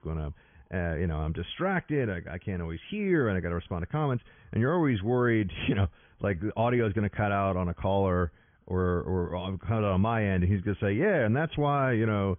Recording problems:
high frequencies cut off; severe; nothing above 3.5 kHz

